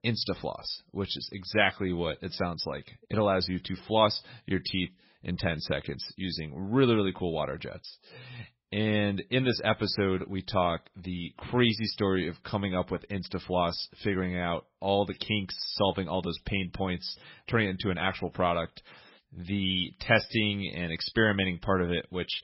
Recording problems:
garbled, watery; badly; nothing above 5.5 kHz

